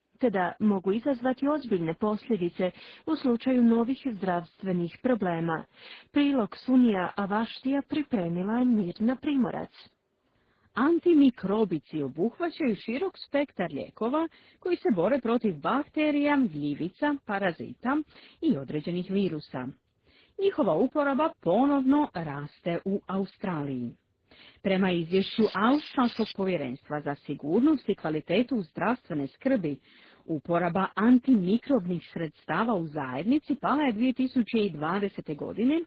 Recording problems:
garbled, watery; badly
muffled; slightly; fading above 4 kHz
crackling; noticeable; from 25 to 26 s; 10 dB below the speech

